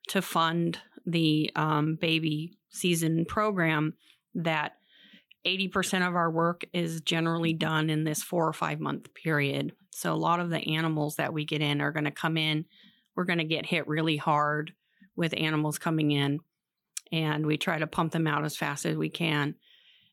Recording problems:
none

